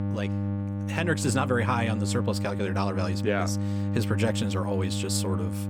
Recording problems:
electrical hum; loud; throughout; 50 Hz, 8 dB below the speech

